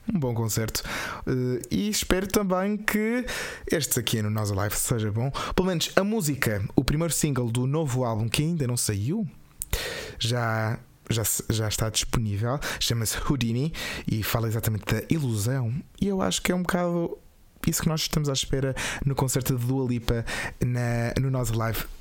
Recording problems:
squashed, flat; heavily

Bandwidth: 16.5 kHz